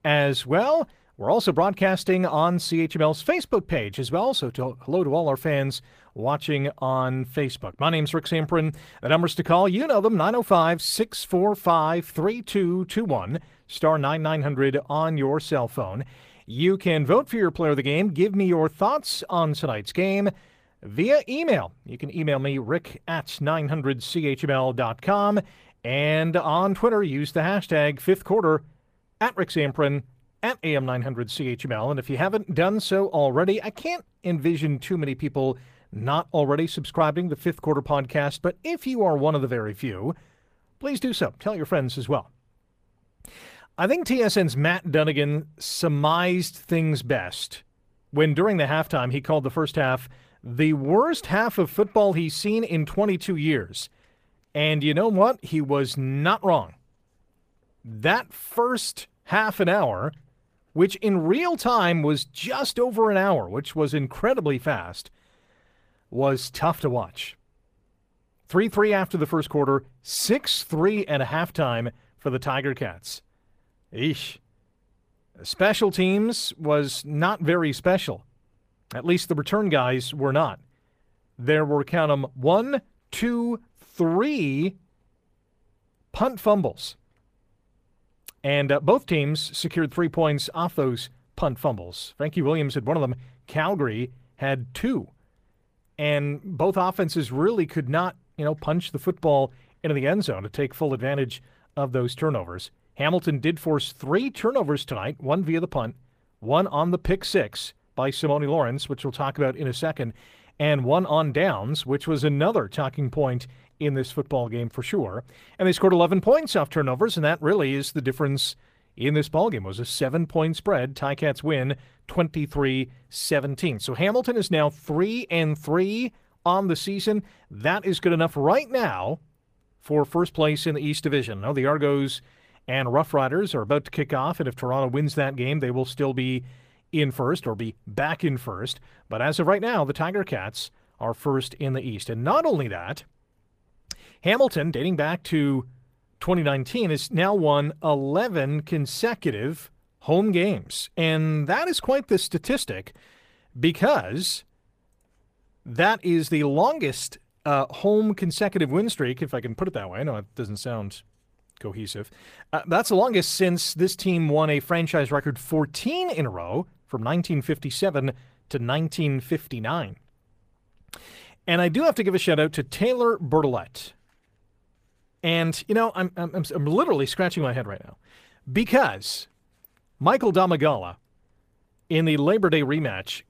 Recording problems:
garbled, watery; slightly; nothing above 15 kHz

